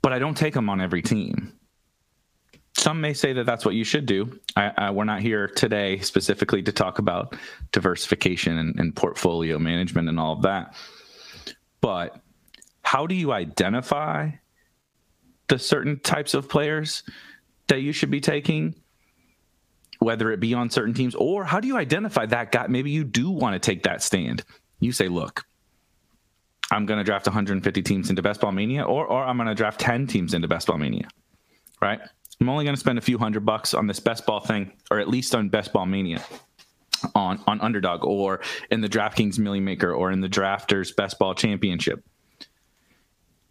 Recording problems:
squashed, flat; heavily

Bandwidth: 15 kHz